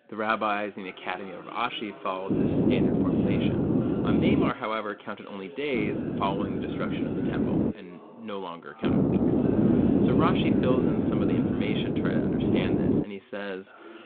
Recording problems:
phone-call audio
wind noise on the microphone; heavy; from 2.5 to 4.5 s, from 5.5 to 7.5 s and from 9 to 13 s; 2 dB above the speech
voice in the background; noticeable; throughout; 15 dB below the speech

